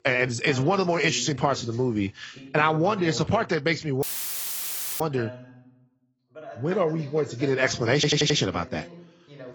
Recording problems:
garbled, watery; badly; nothing above 7.5 kHz
voice in the background; noticeable; throughout; 20 dB below the speech
audio cutting out; filled with static; at 4 s for 1 s
audio stuttering; at 8 s

